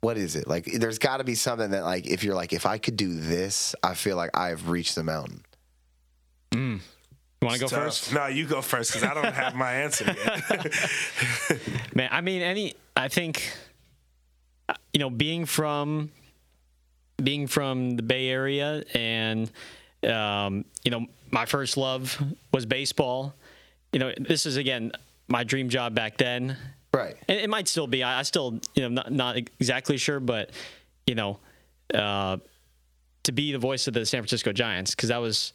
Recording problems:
squashed, flat; somewhat

